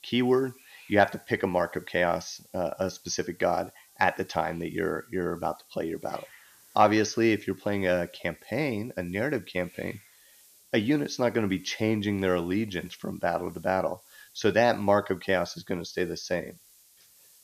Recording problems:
high frequencies cut off; noticeable; nothing above 6.5 kHz
hiss; faint; throughout; 25 dB below the speech

